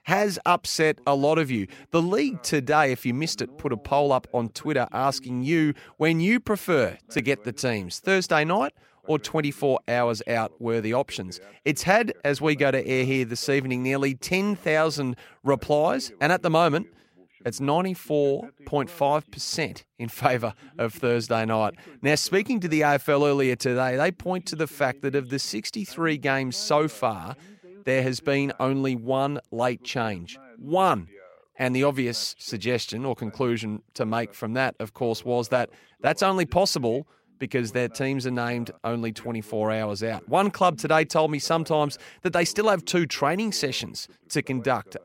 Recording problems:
voice in the background; faint; throughout; 25 dB below the speech

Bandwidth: 16 kHz